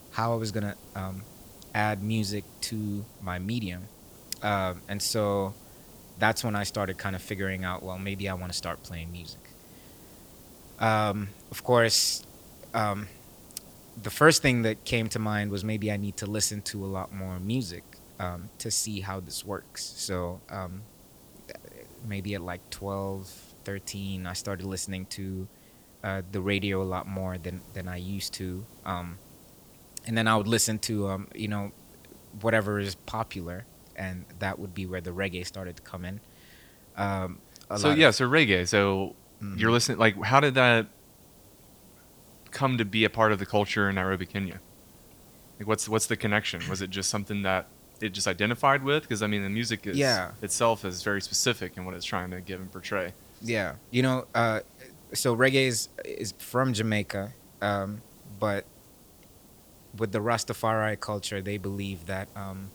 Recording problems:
hiss; faint; throughout; 25 dB below the speech

